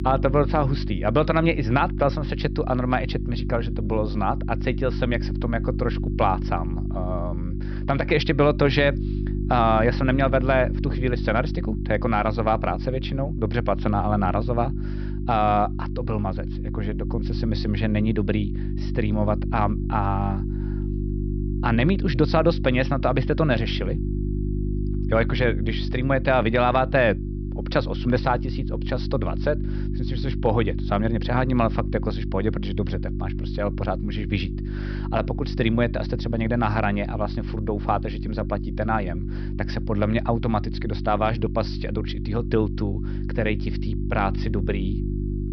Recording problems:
high frequencies cut off; noticeable; nothing above 5.5 kHz
electrical hum; noticeable; throughout; 50 Hz, 15 dB below the speech

